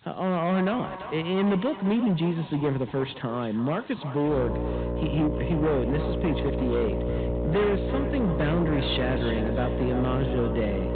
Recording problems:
high frequencies cut off; severe; nothing above 4 kHz
echo of what is said; noticeable; throughout; 340 ms later, 15 dB below the speech
distortion; slight; 13% of the sound clipped
electrical hum; loud; from 4.5 s on; 60 Hz, 3 dB below the speech
rain or running water; faint; throughout; 25 dB below the speech

